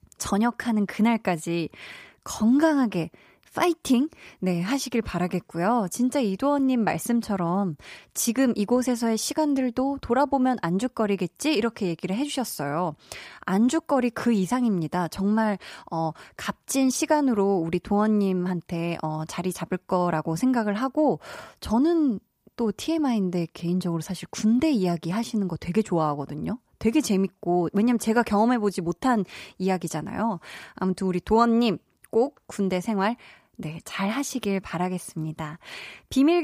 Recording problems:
abrupt cut into speech; at the end

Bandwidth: 15 kHz